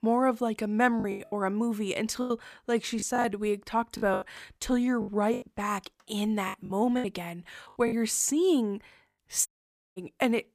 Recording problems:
choppy; very; 9% of the speech affected
audio cutting out; at 9.5 s for 0.5 s

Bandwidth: 15 kHz